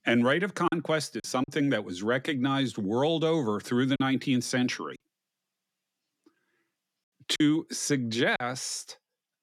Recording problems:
choppy; occasionally; 4% of the speech affected

